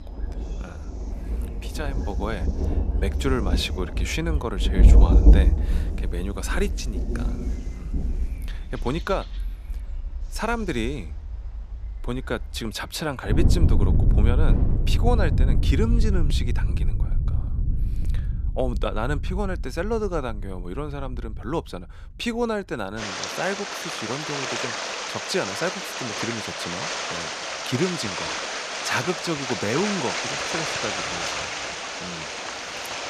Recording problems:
rain or running water; very loud; throughout; 4 dB above the speech

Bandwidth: 14.5 kHz